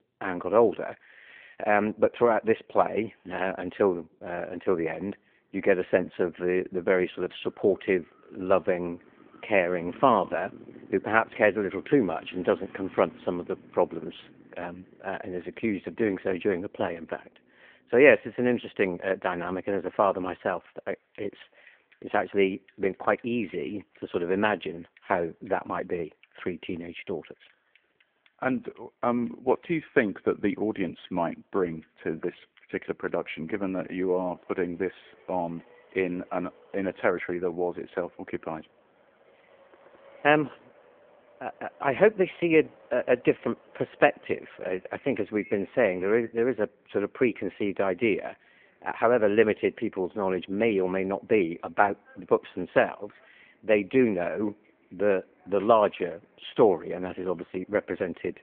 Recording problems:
phone-call audio
traffic noise; faint; throughout; 25 dB below the speech

